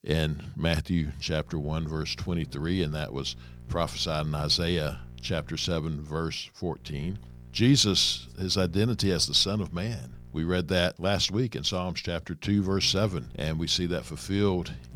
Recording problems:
electrical hum; faint; from 1.5 to 5.5 s, from 7 to 11 s and from 13 s on; 60 Hz, 30 dB below the speech

